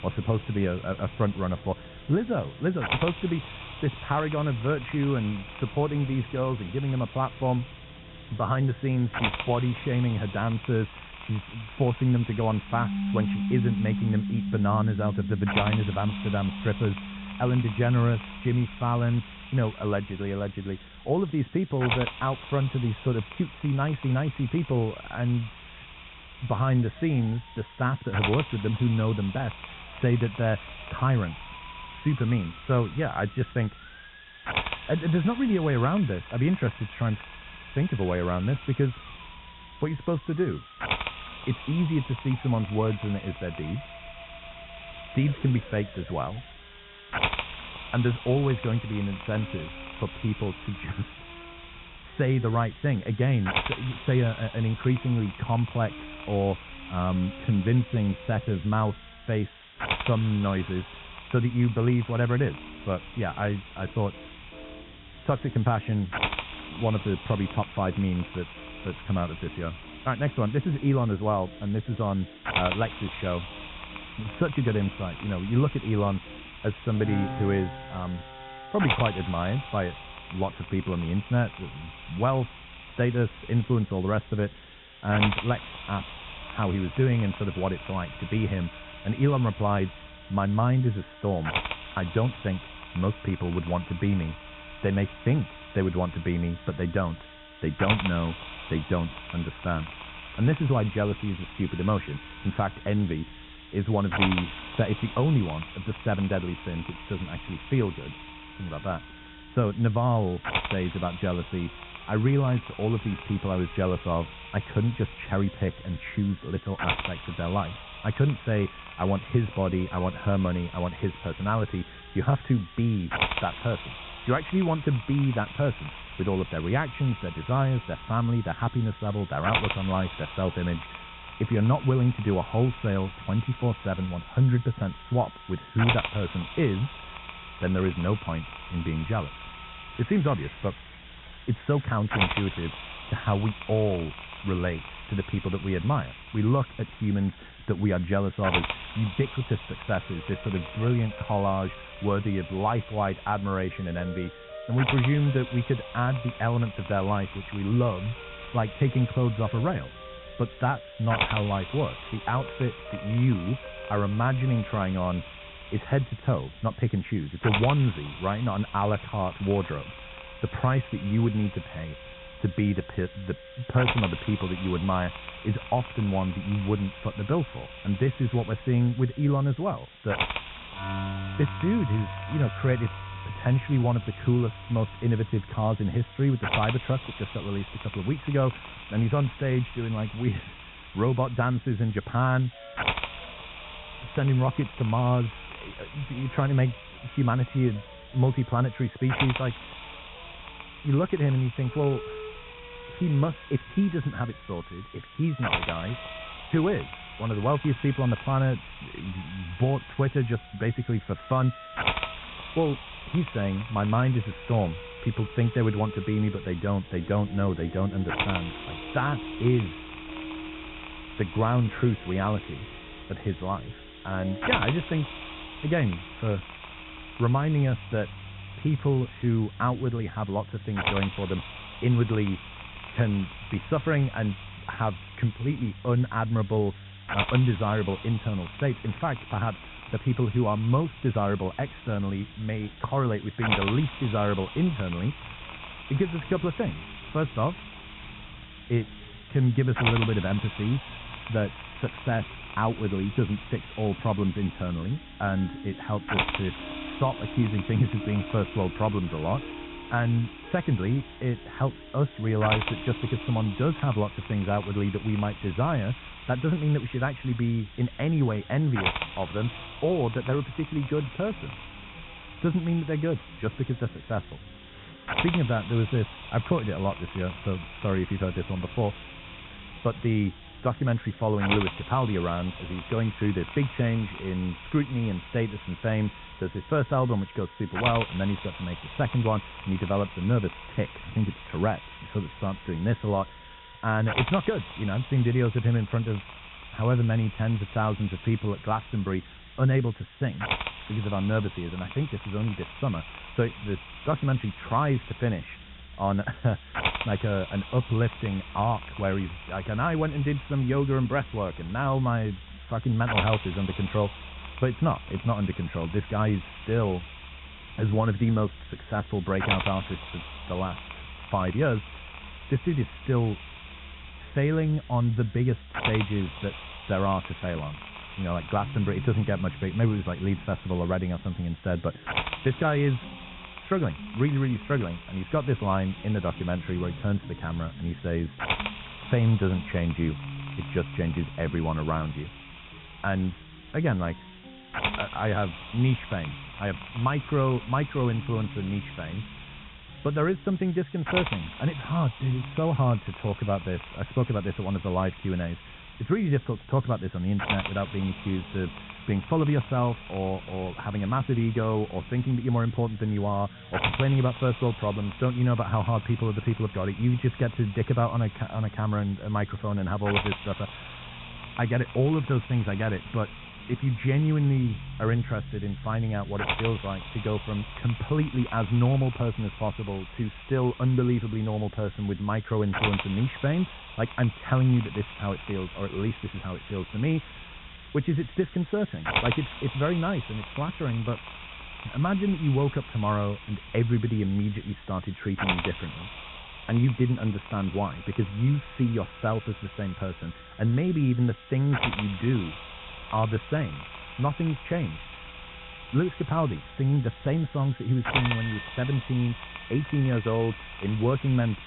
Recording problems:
high frequencies cut off; severe; nothing above 3.5 kHz
muffled; very slightly; fading above 1.5 kHz
hiss; loud; throughout; 9 dB below the speech
background music; noticeable; throughout; 15 dB below the speech

